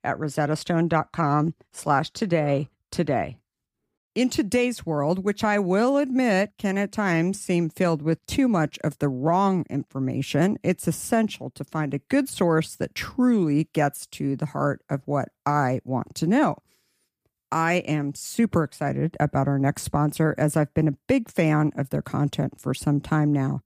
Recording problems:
none

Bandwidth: 15 kHz